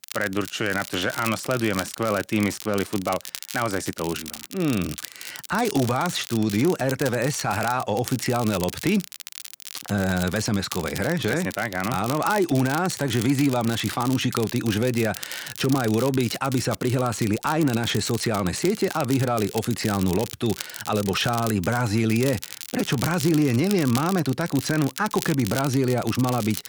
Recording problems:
crackle, like an old record; noticeable; 10 dB below the speech

